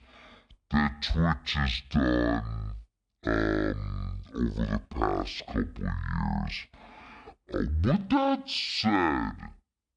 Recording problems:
wrong speed and pitch; too slow and too low; 0.5 times normal speed

